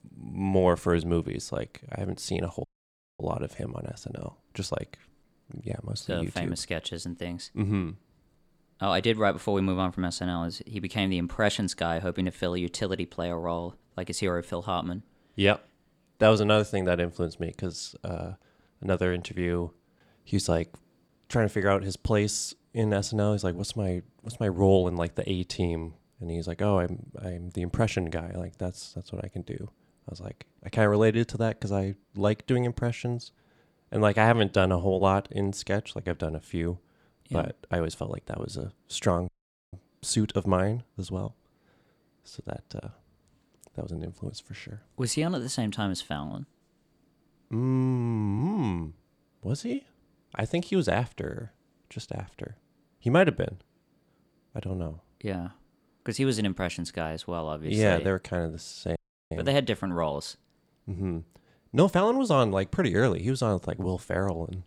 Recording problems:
audio cutting out; at 2.5 s for 0.5 s, at 39 s and at 59 s

